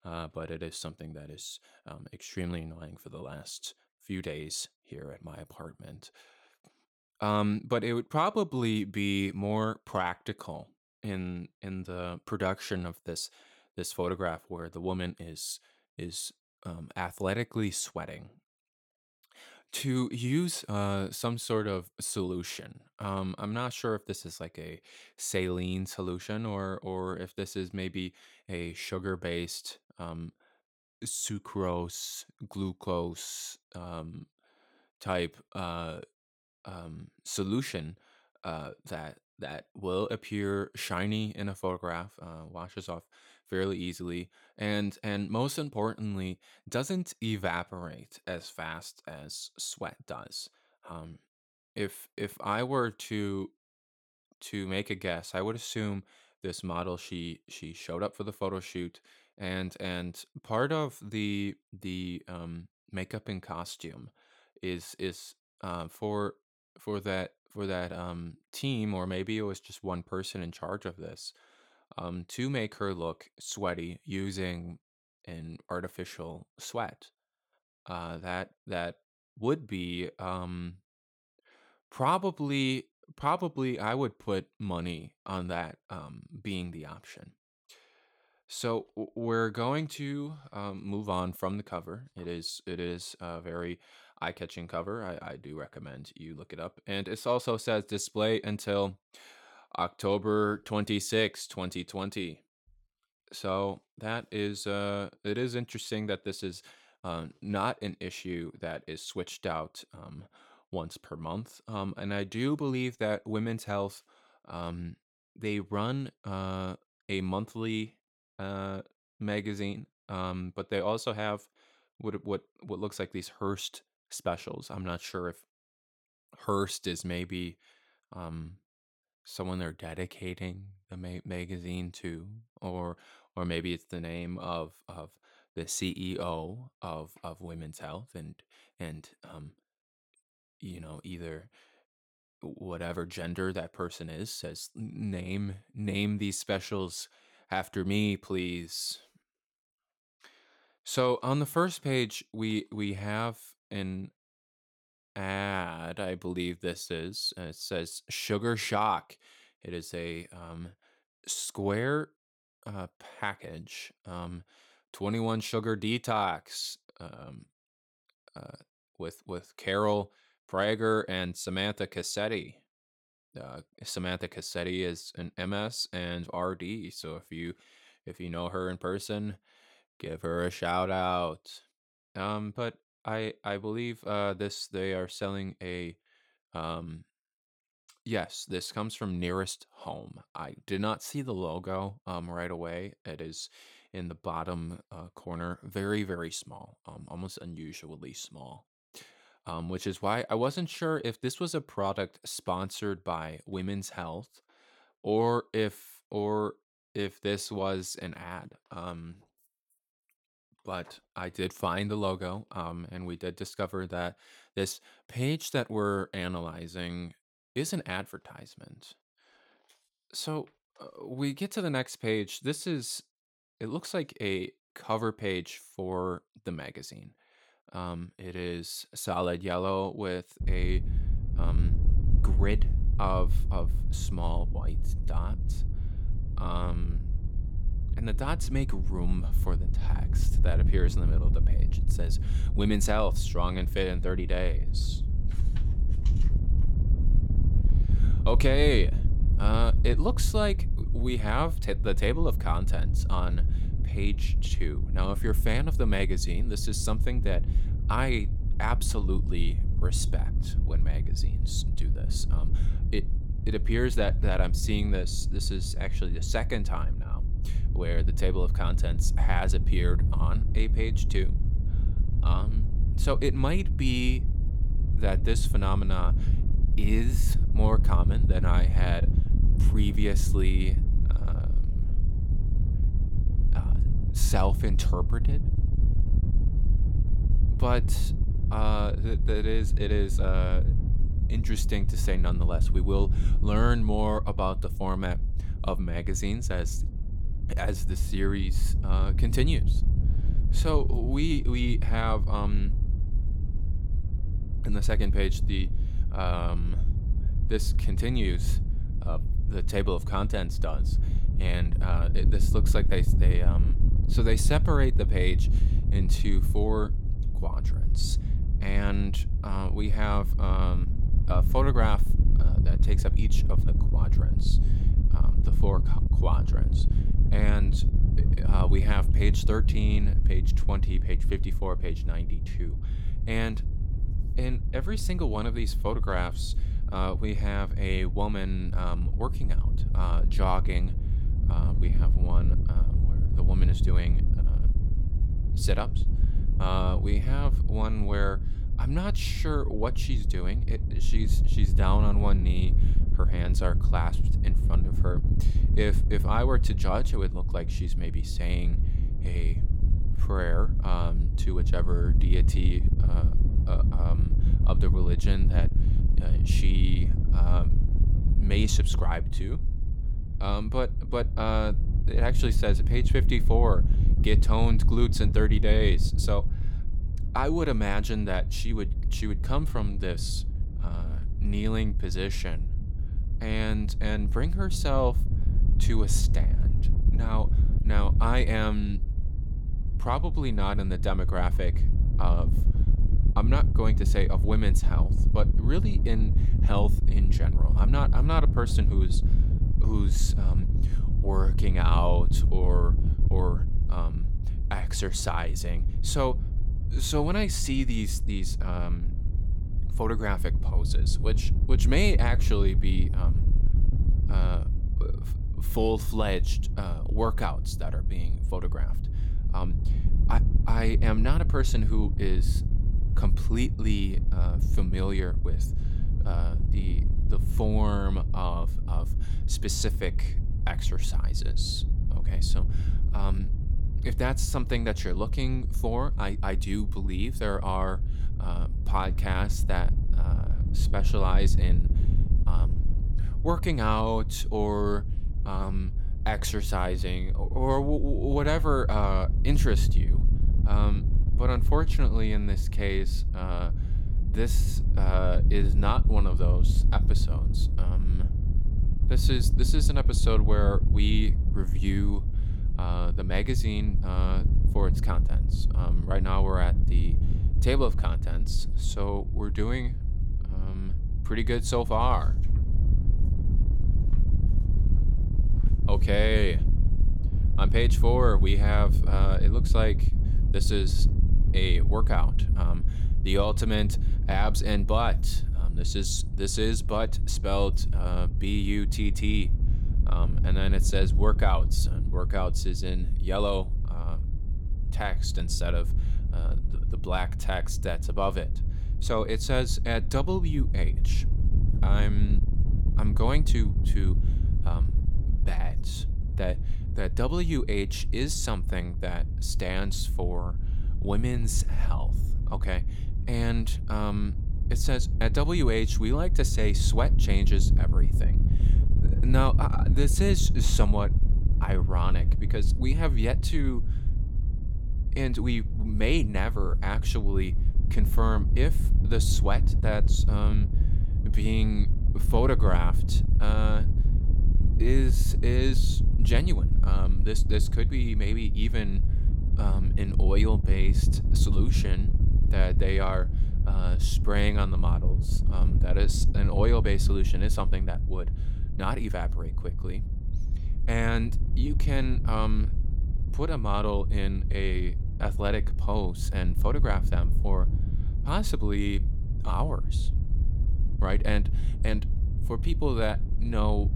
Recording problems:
wind noise on the microphone; occasional gusts; from 3:50 on; 10 dB below the speech

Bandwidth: 17.5 kHz